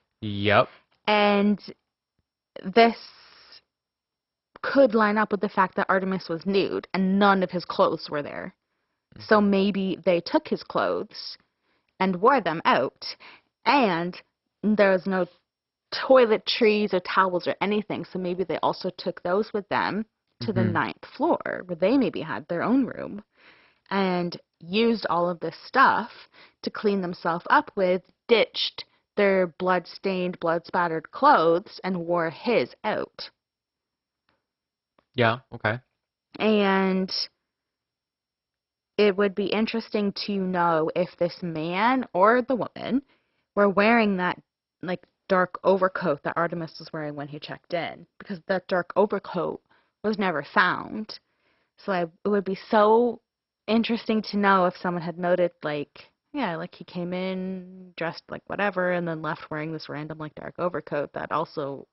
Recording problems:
garbled, watery; badly; nothing above 5.5 kHz

